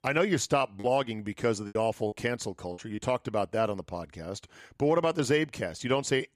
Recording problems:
choppy; occasionally; 4% of the speech affected

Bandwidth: 15 kHz